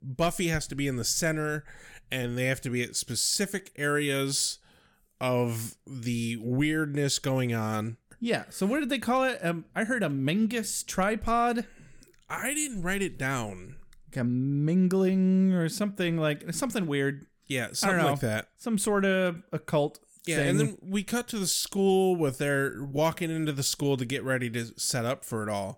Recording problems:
none

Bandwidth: 18 kHz